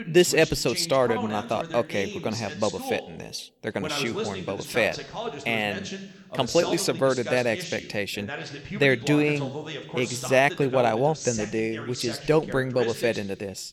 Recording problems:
voice in the background; loud; throughout; 9 dB below the speech

